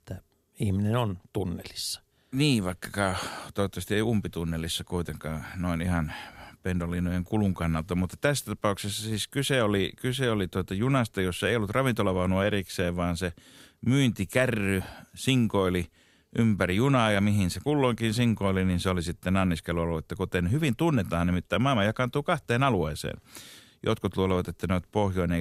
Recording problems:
abrupt cut into speech; at the end

